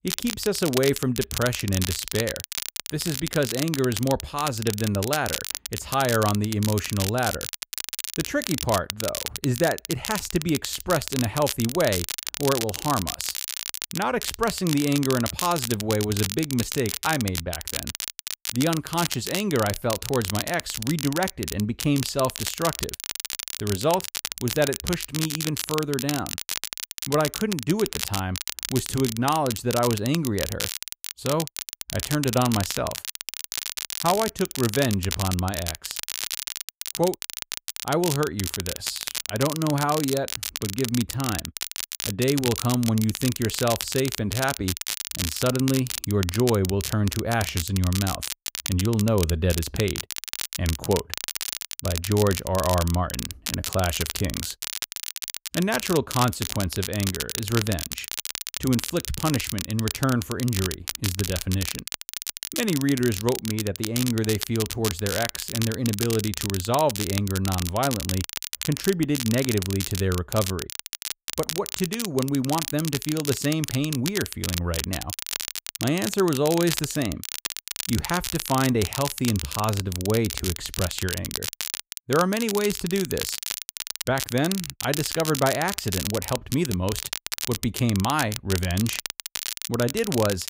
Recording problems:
crackle, like an old record; loud; 4 dB below the speech

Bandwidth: 15.5 kHz